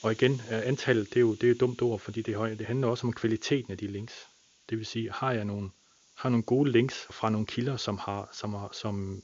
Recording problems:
high frequencies cut off; noticeable; nothing above 7 kHz
hiss; faint; throughout; 25 dB below the speech

